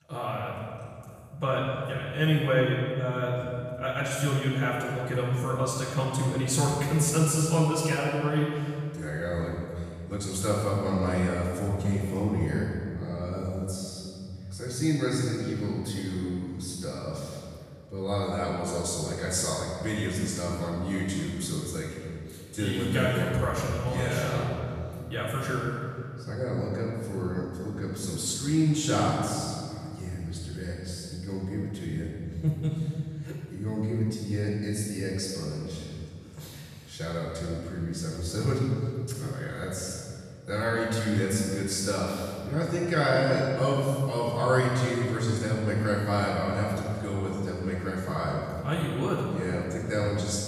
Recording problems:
room echo; strong; dies away in 2.4 s
off-mic speech; far

